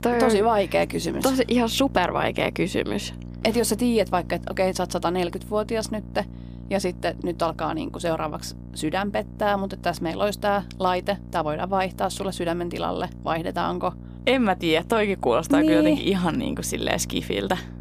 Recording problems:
electrical hum; faint; throughout; 60 Hz, 25 dB below the speech

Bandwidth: 15 kHz